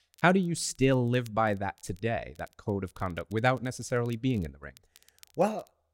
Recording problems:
crackle, like an old record; faint; 30 dB below the speech

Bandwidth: 16 kHz